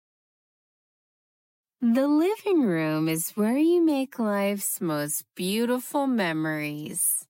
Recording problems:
wrong speed, natural pitch; too slow; 0.6 times normal speed

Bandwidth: 16 kHz